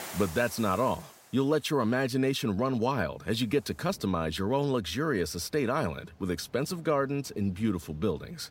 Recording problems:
rain or running water; faint; throughout; 20 dB below the speech

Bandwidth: 16 kHz